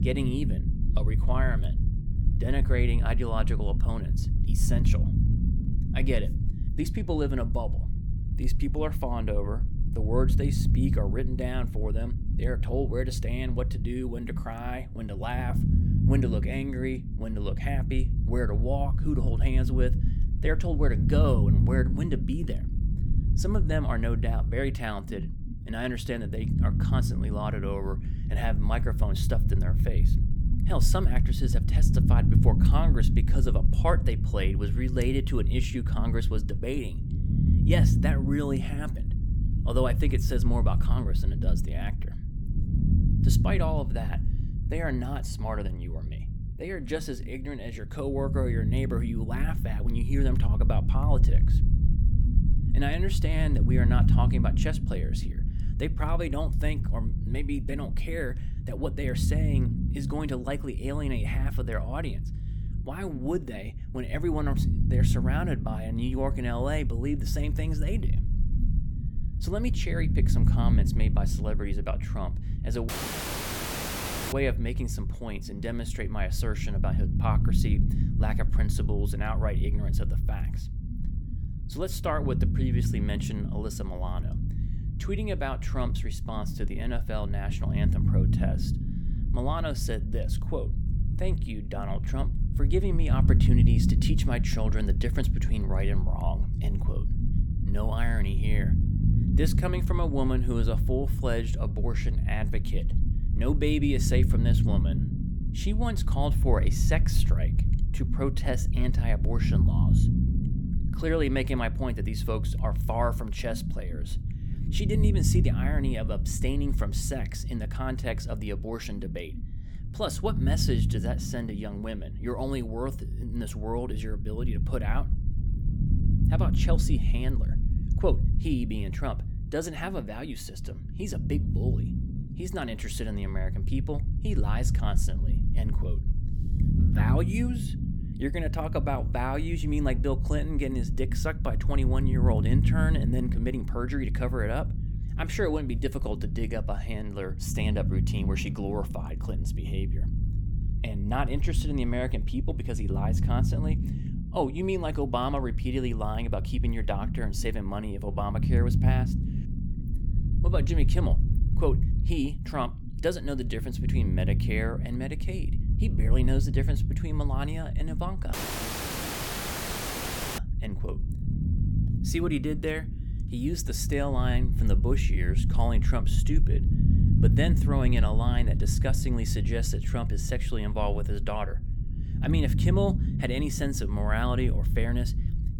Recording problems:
low rumble; loud; throughout; 7 dB below the speech
audio cutting out; at 1:13 for 1.5 s and at 2:48 for 2 s

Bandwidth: 18 kHz